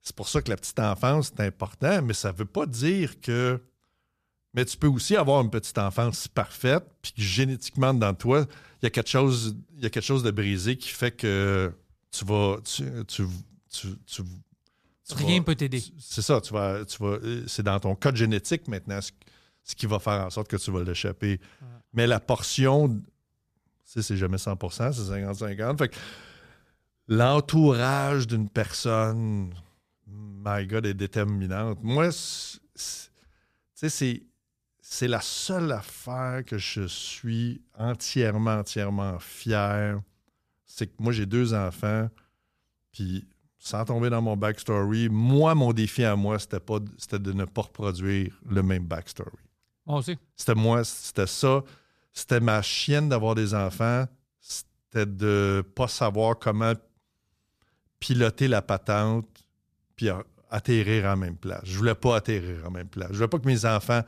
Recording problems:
none

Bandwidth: 14.5 kHz